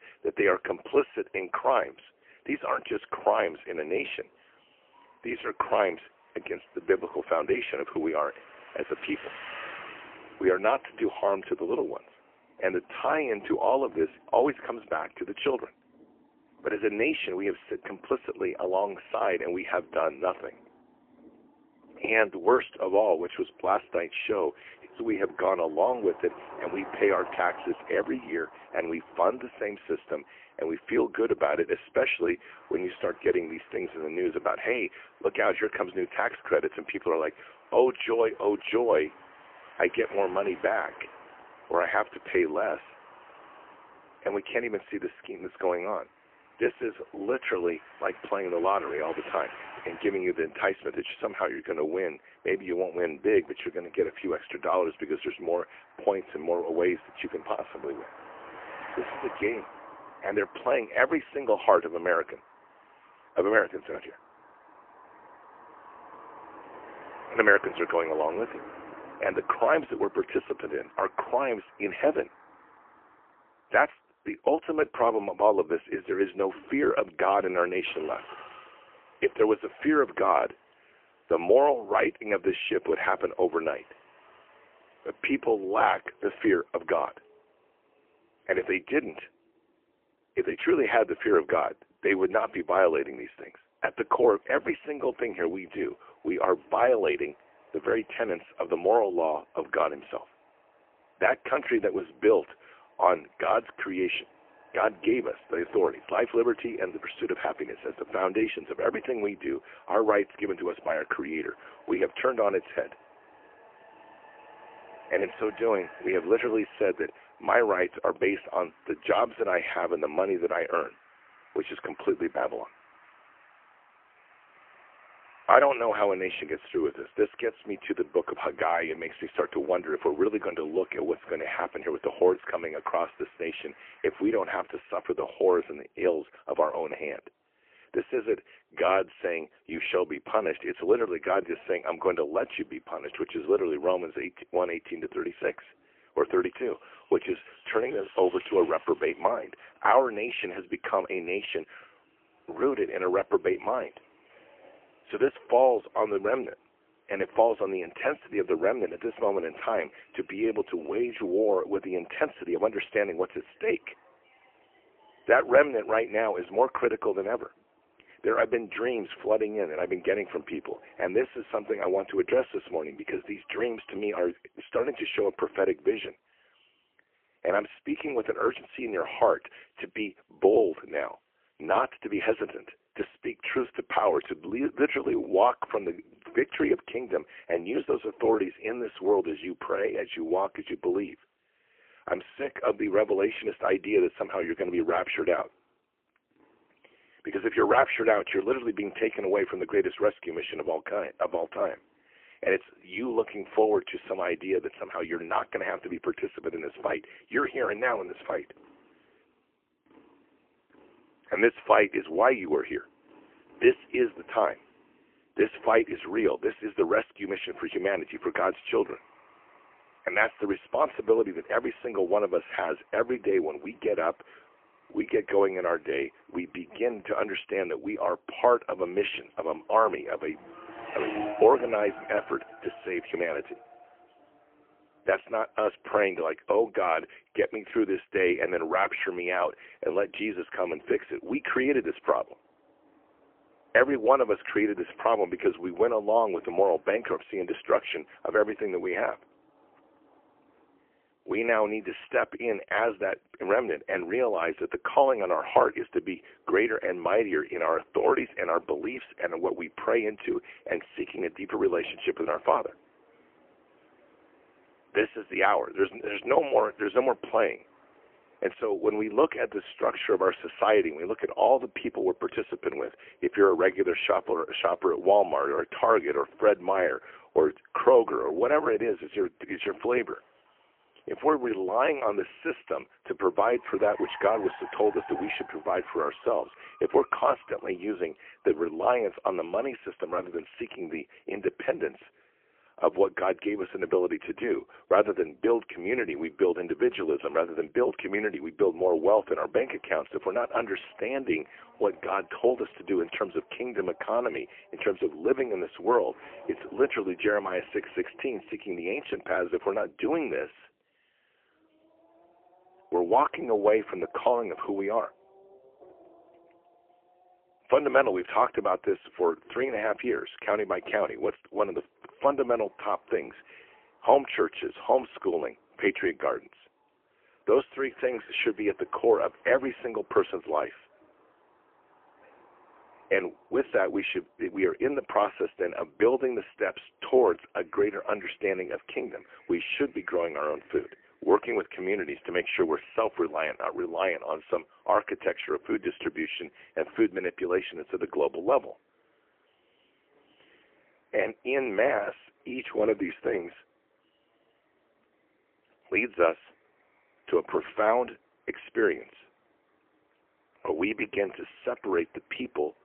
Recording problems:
phone-call audio; poor line; nothing above 3 kHz
traffic noise; faint; throughout; 25 dB below the speech

